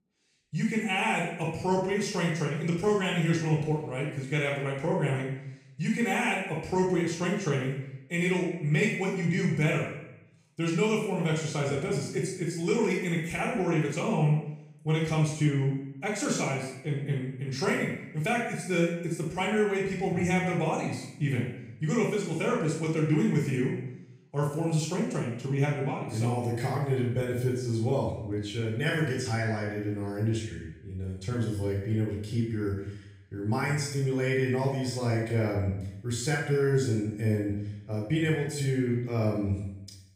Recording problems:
off-mic speech; far
room echo; noticeable; dies away in 0.7 s

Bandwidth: 15.5 kHz